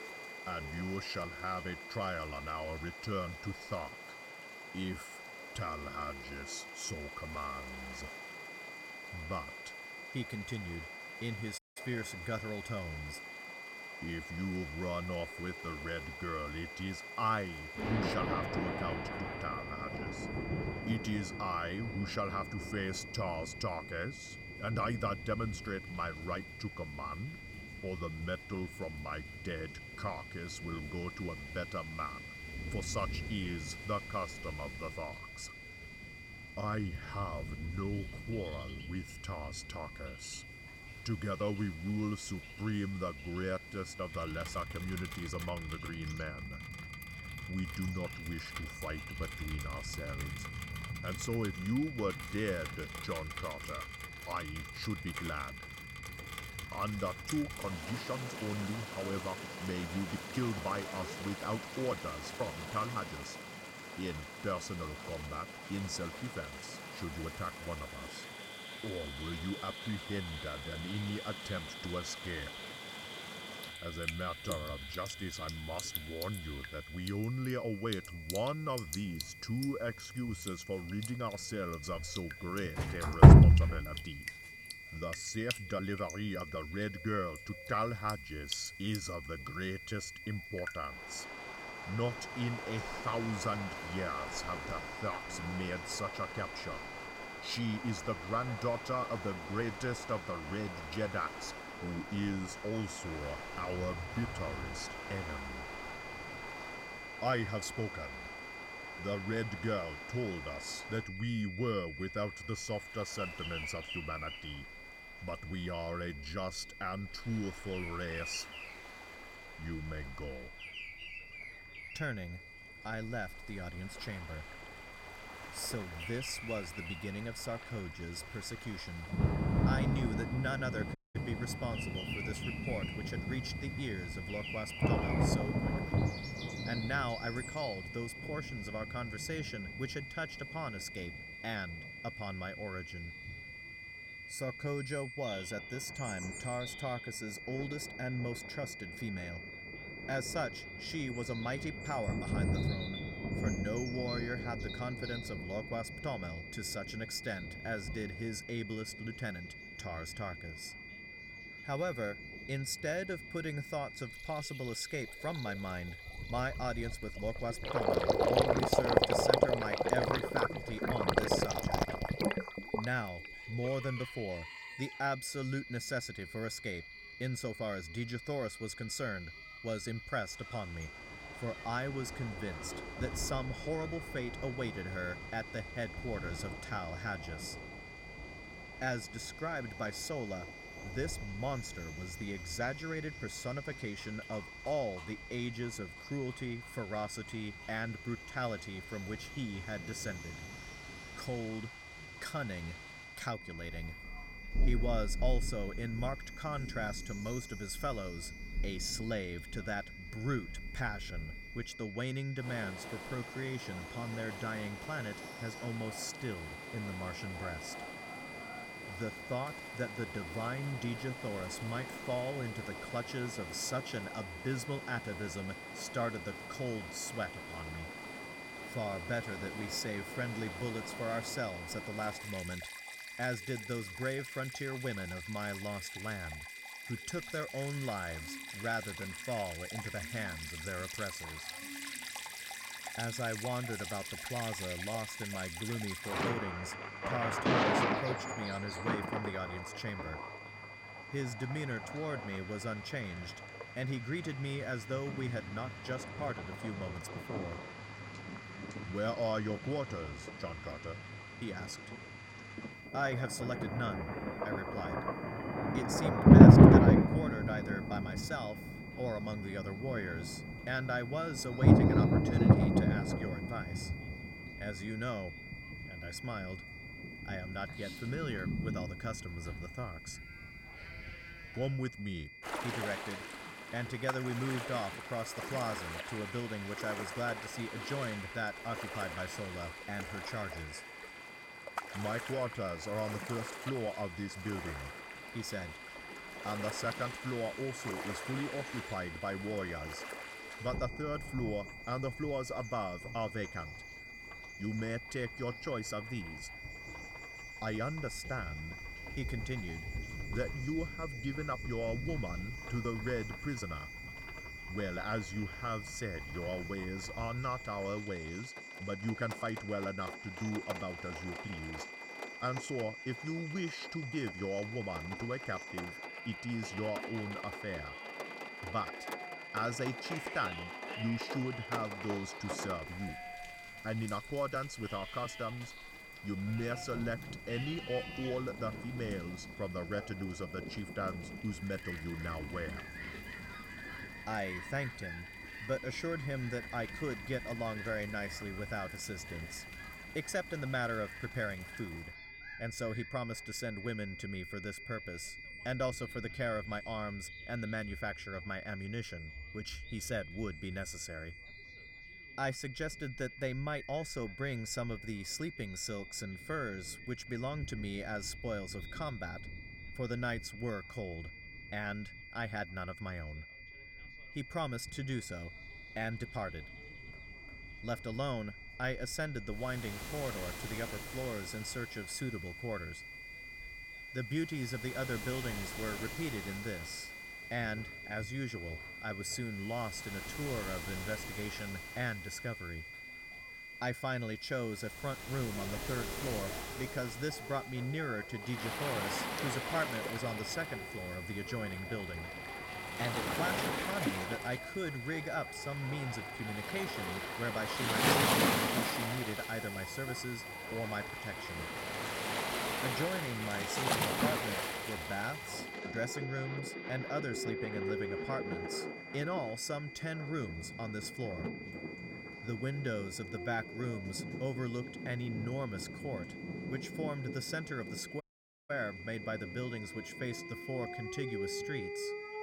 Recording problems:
rain or running water; very loud; throughout; 4 dB above the speech
high-pitched whine; loud; throughout; 2 kHz, 8 dB below the speech
animal sounds; noticeable; throughout; 10 dB below the speech
background chatter; faint; throughout; 2 voices, 30 dB below the speech
audio cutting out; at 12 s, at 2:11 and at 7:08

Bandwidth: 16.5 kHz